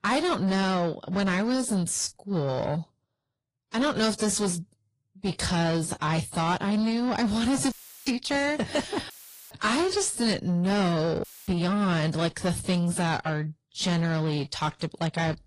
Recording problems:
distortion; slight; 10 dB below the speech
garbled, watery; slightly; nothing above 10.5 kHz
audio cutting out; filled with static; at 7.5 s, at 9 s and at 11 s

